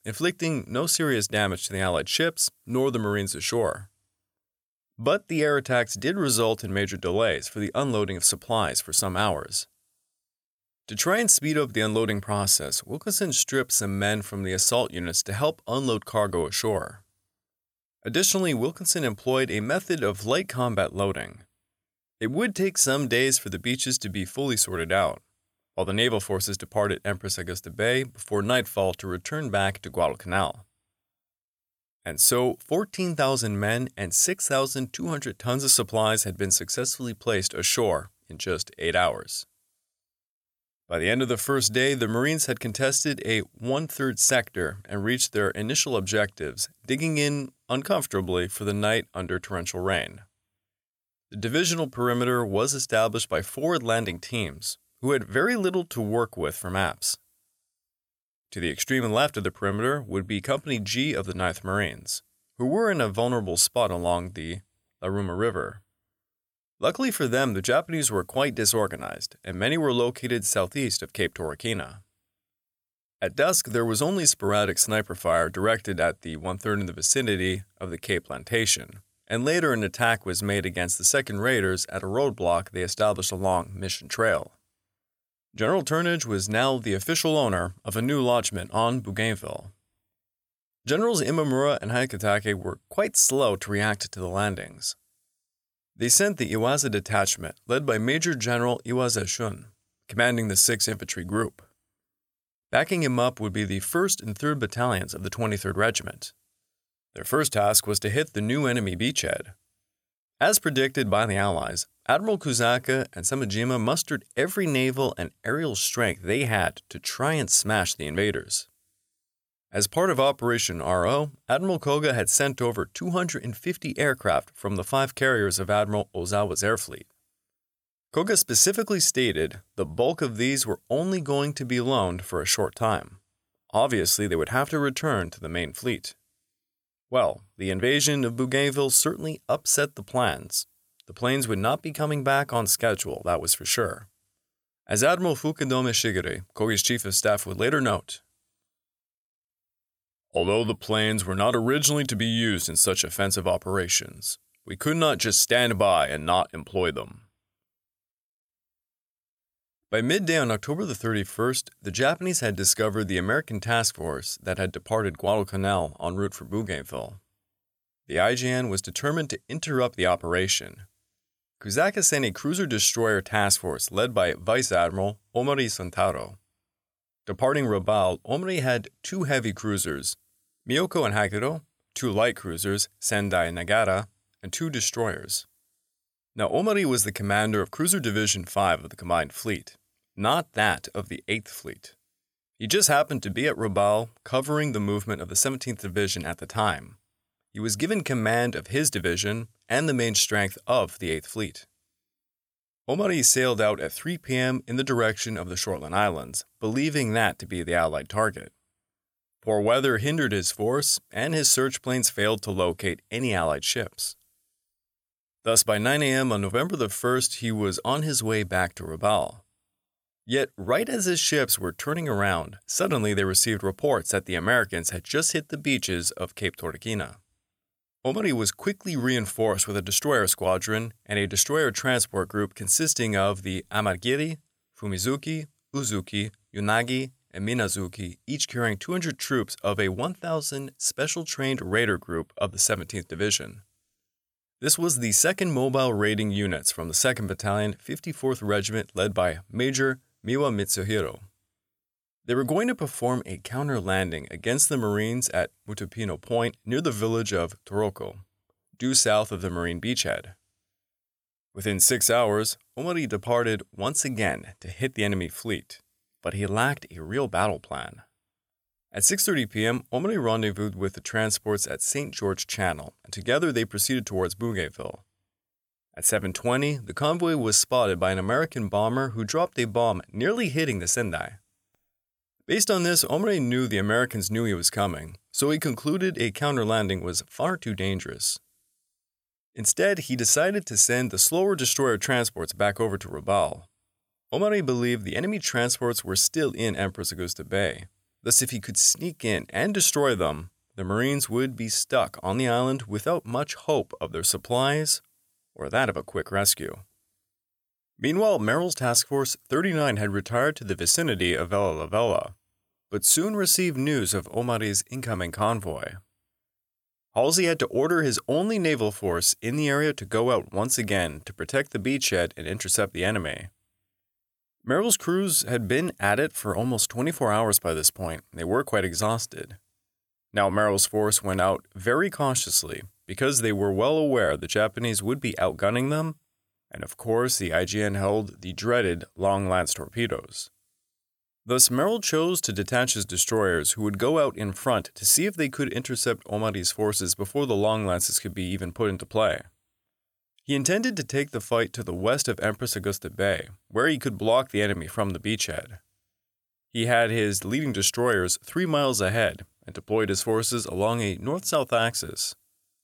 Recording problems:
none

